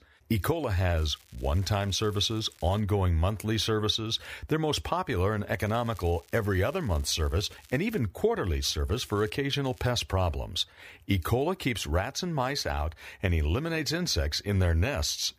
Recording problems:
crackling; faint; 4 times, first at 1 s; 25 dB below the speech

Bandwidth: 15 kHz